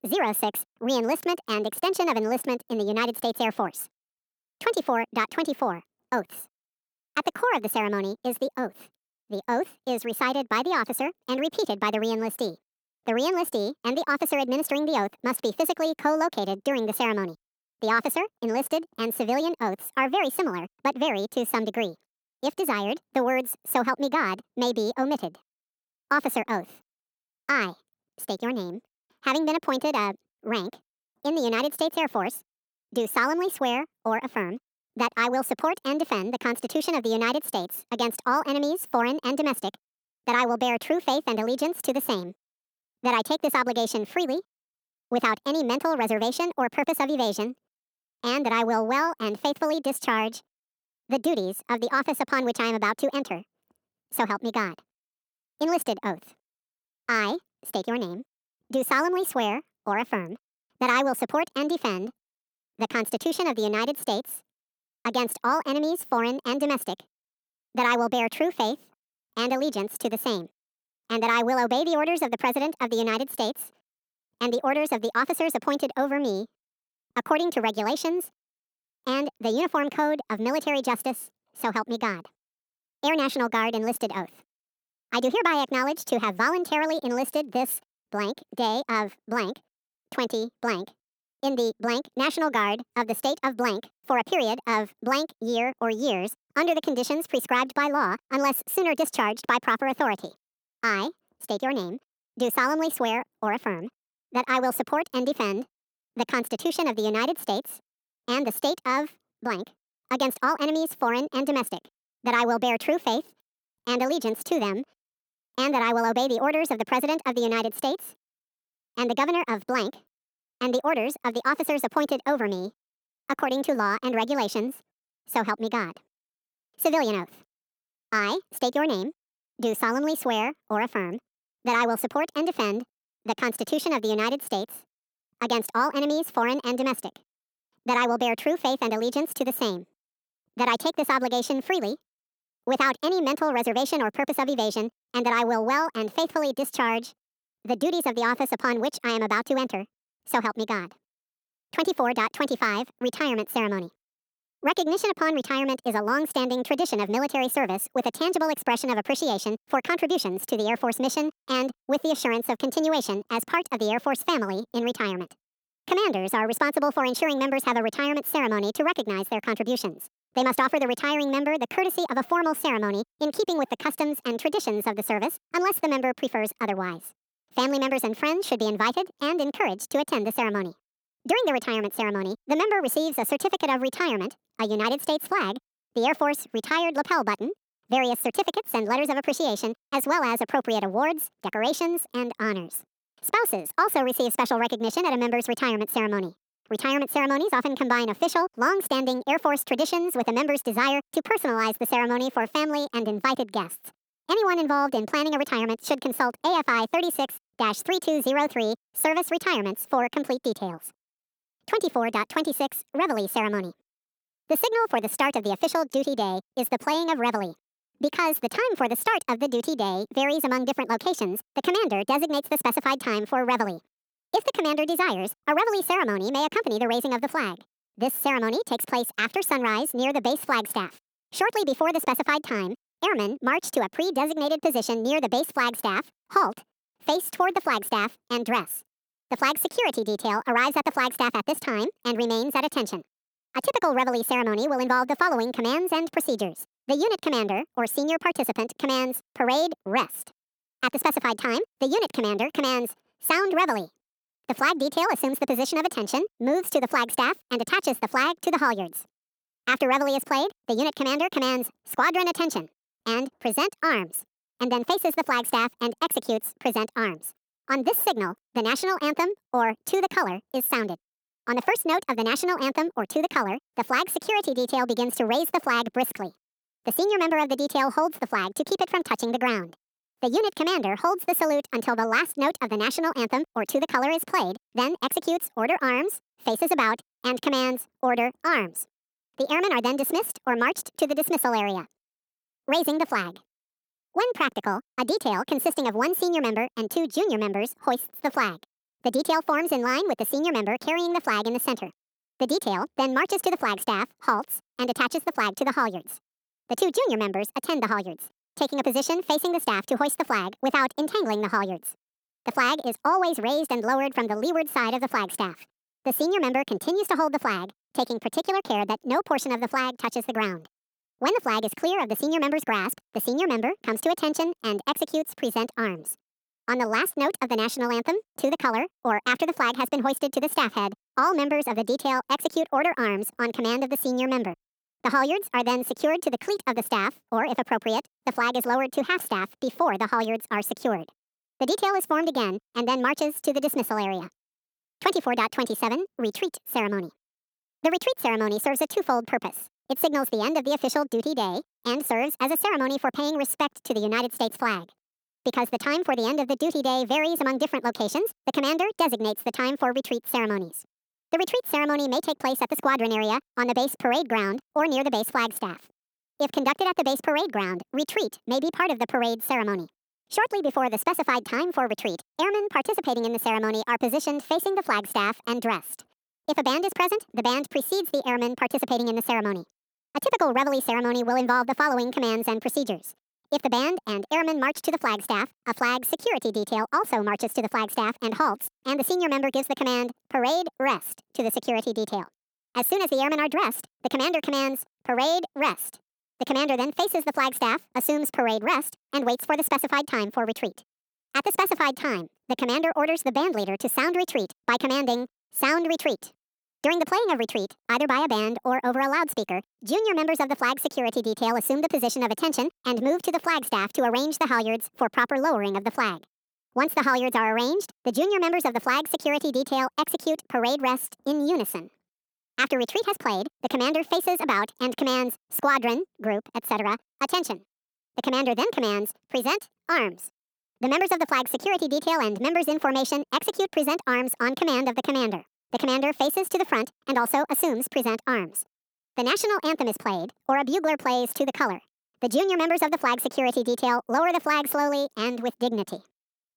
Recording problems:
wrong speed and pitch; too fast and too high; 1.5 times normal speed

